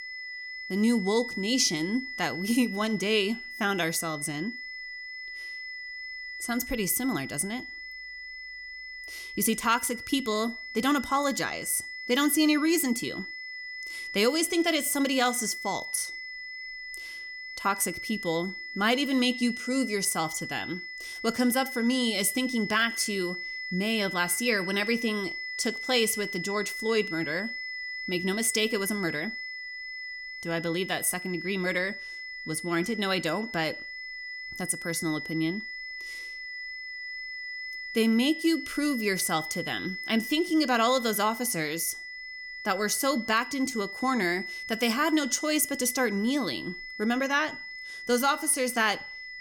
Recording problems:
high-pitched whine; loud; throughout; 2 kHz, 8 dB below the speech

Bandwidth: 18 kHz